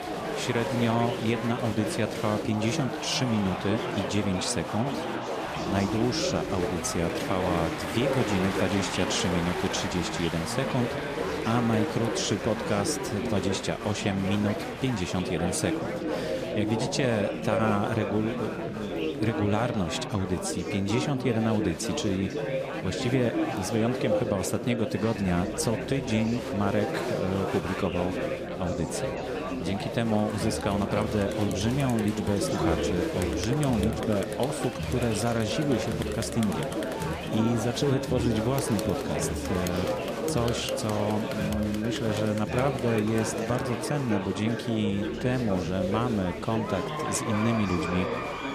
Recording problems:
chatter from many people; loud; throughout; 2 dB below the speech

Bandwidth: 14.5 kHz